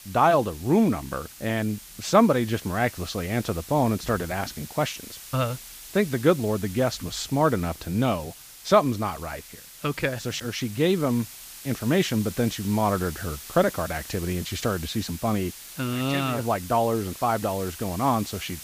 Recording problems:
hiss; noticeable; throughout; 15 dB below the speech

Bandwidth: 15 kHz